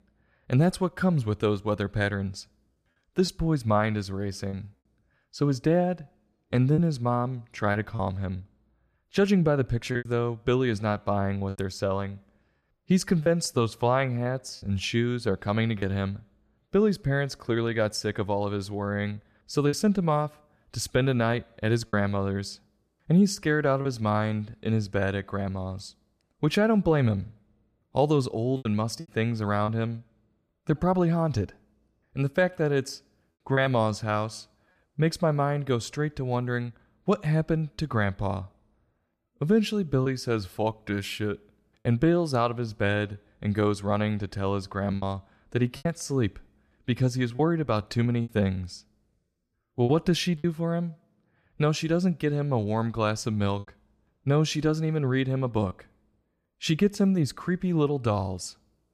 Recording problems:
choppy; occasionally; 3% of the speech affected

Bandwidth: 15 kHz